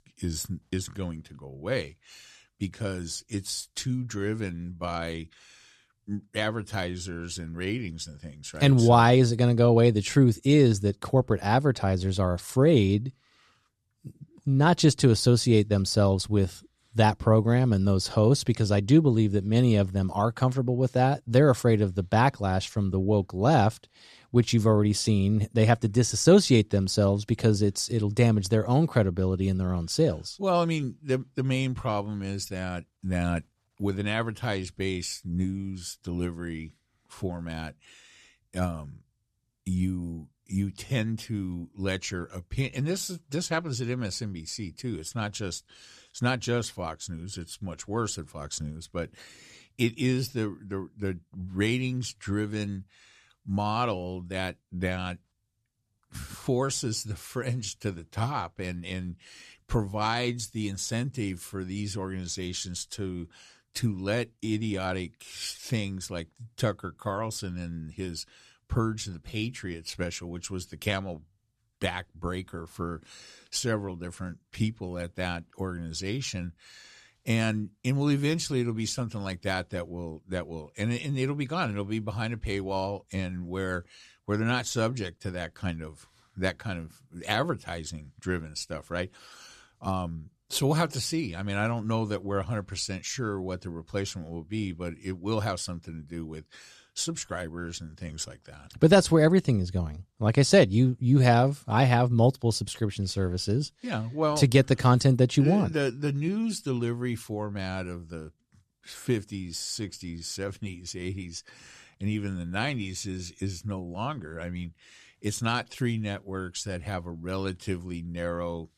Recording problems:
none

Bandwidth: 13.5 kHz